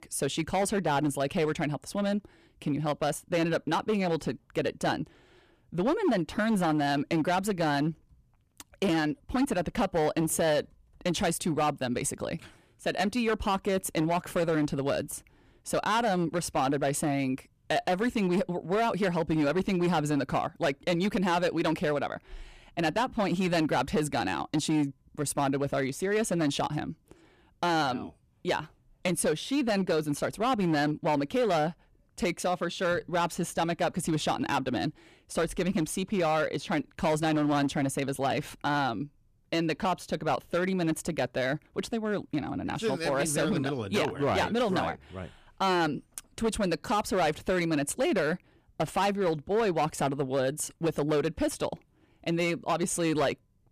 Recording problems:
distortion; slight; 8% of the sound clipped

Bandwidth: 14.5 kHz